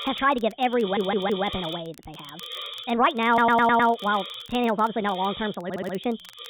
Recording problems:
high frequencies cut off; severe; nothing above 4 kHz
wrong speed and pitch; too fast and too high; 1.5 times normal speed
hiss; noticeable; throughout; 15 dB below the speech
crackle, like an old record; faint; 30 dB below the speech
audio stuttering; at 1 s, at 3.5 s and at 5.5 s

